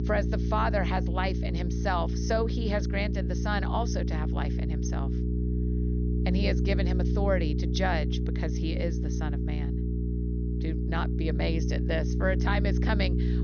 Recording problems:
high frequencies cut off; noticeable; nothing above 6.5 kHz
electrical hum; loud; throughout; 60 Hz, 7 dB below the speech

